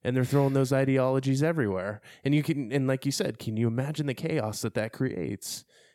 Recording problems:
none

